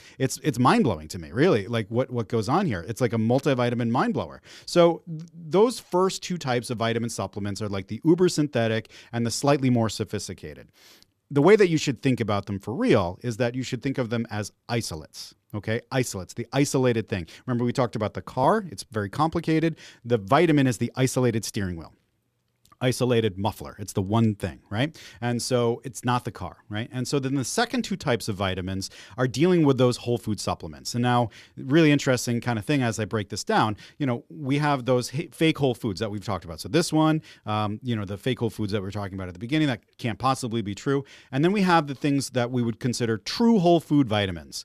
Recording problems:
none

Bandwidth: 14.5 kHz